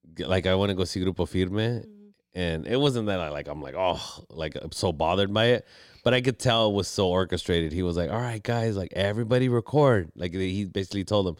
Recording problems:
none

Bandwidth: 16 kHz